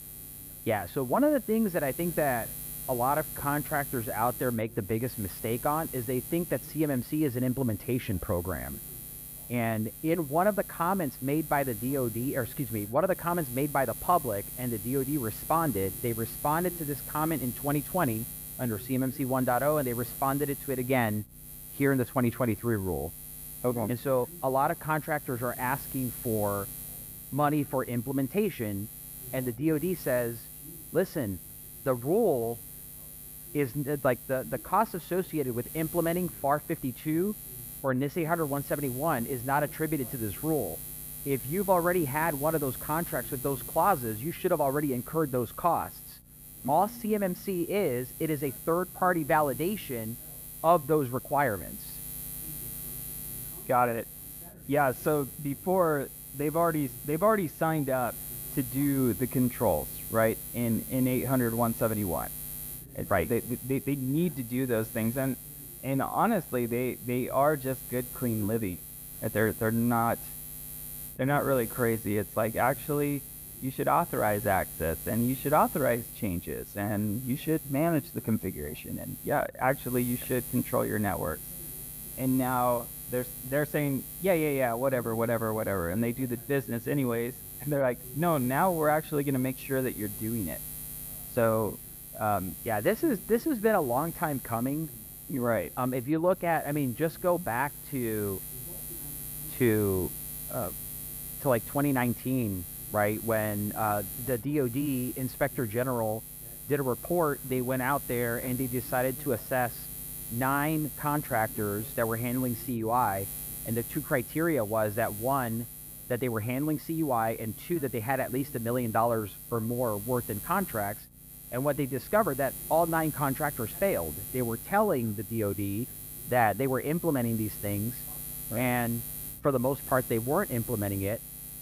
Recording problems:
muffled; very; fading above 4 kHz
electrical hum; noticeable; throughout; 60 Hz, 15 dB below the speech
voice in the background; faint; throughout; 25 dB below the speech

